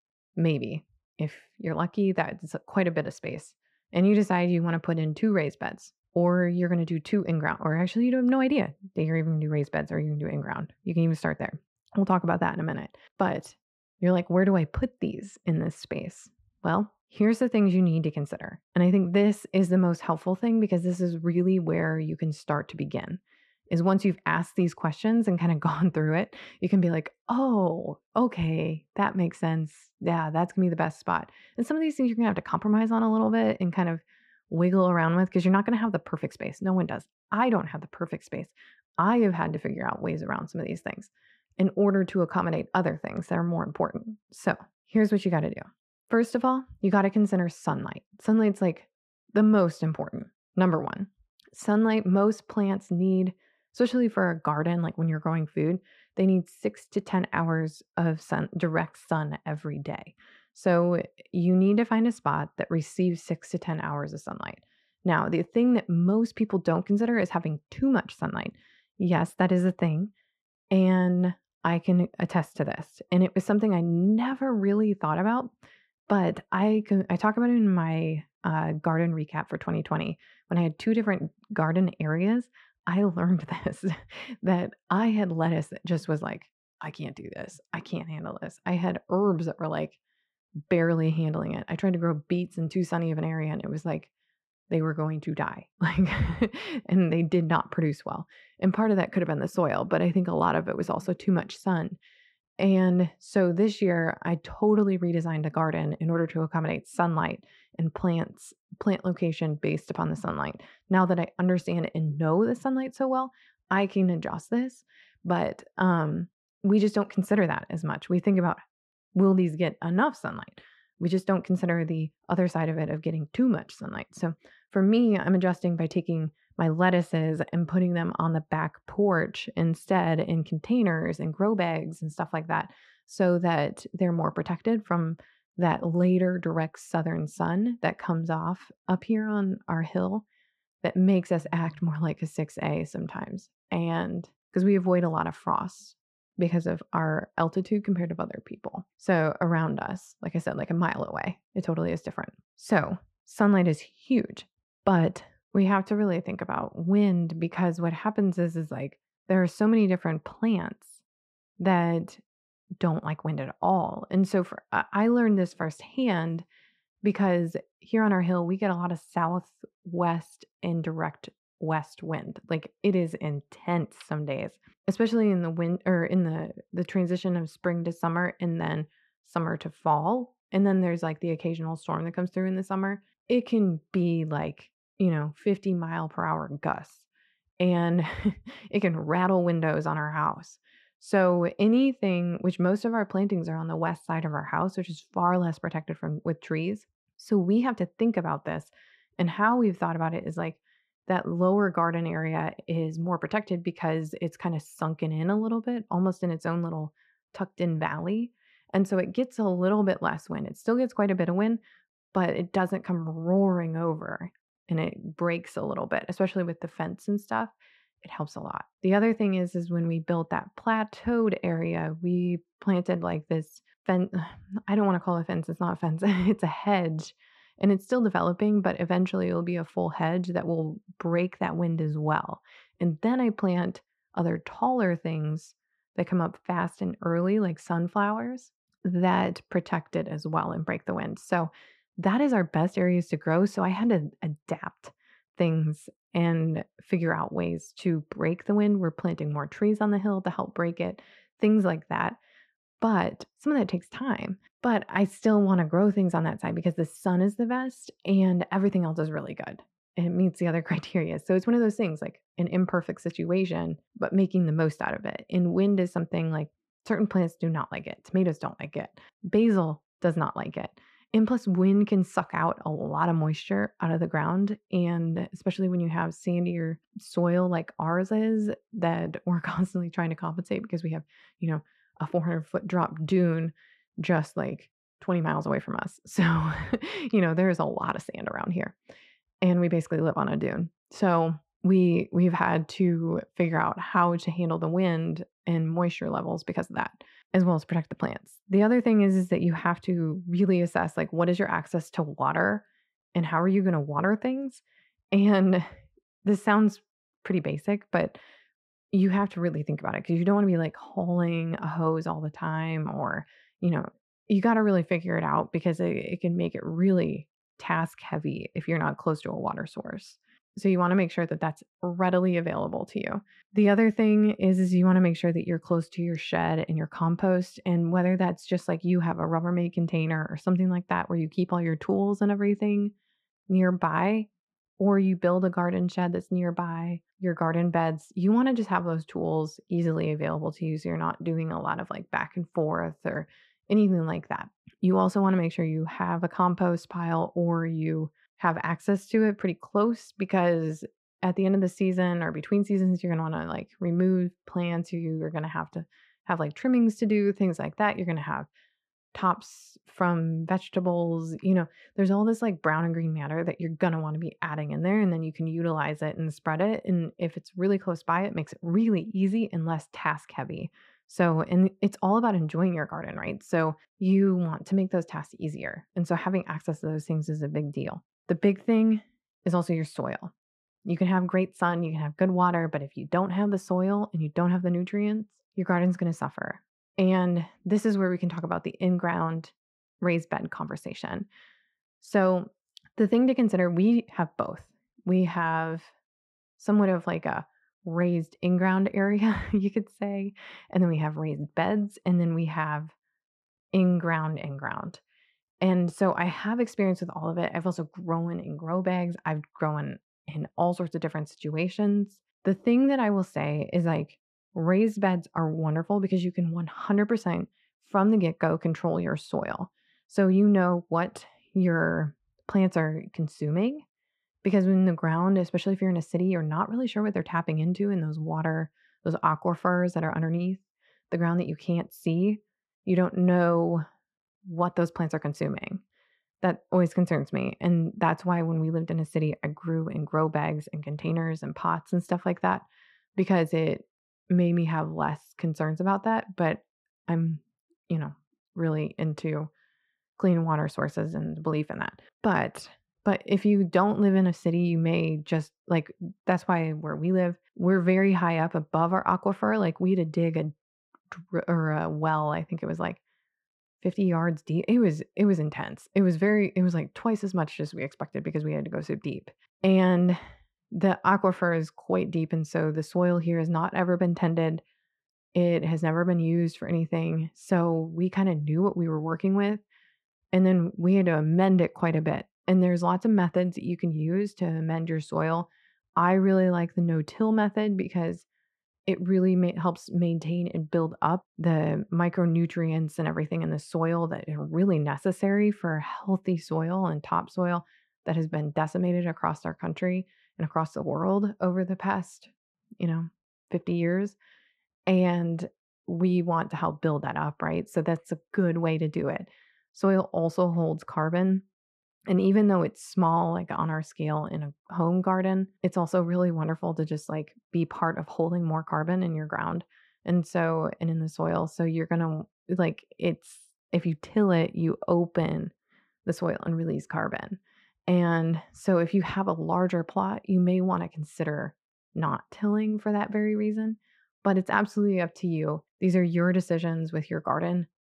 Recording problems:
muffled; very; fading above 3 kHz

